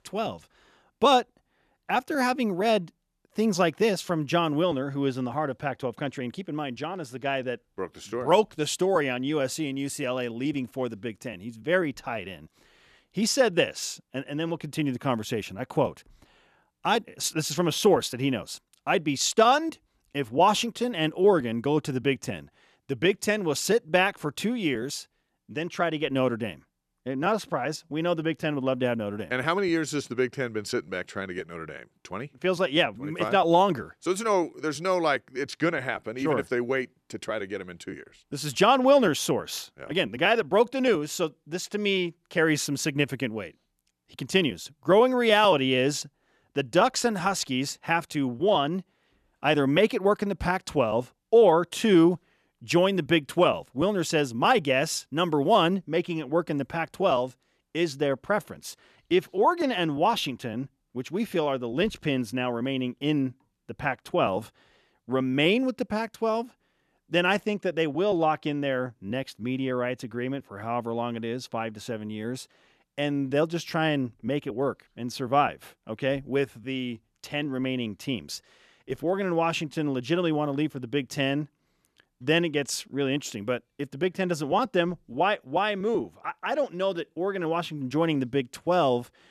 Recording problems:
none

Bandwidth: 14 kHz